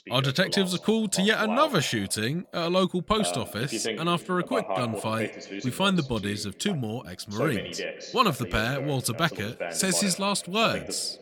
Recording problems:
voice in the background; loud; throughout; 9 dB below the speech

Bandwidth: 18 kHz